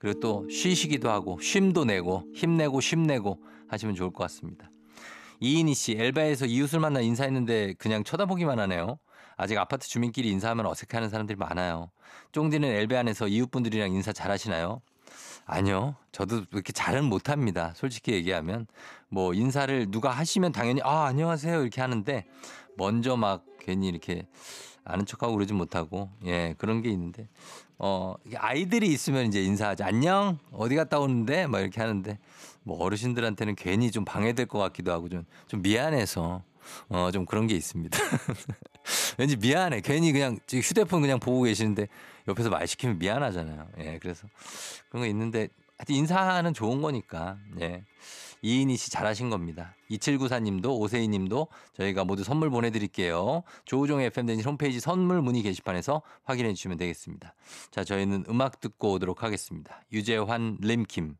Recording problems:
background music; faint; throughout; 25 dB below the speech

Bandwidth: 14.5 kHz